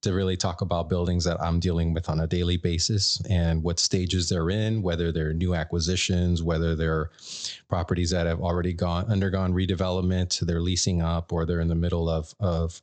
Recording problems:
high frequencies cut off; noticeable; nothing above 8 kHz

